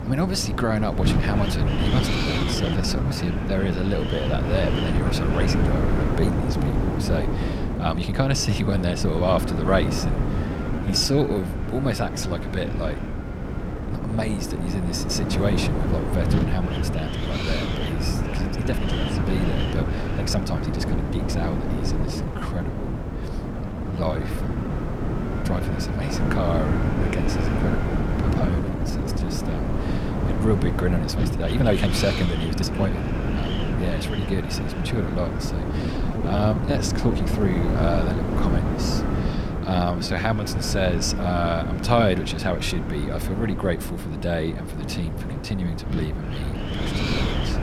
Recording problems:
wind noise on the microphone; heavy; 2 dB below the speech
uneven, jittery; strongly; from 2 to 40 s

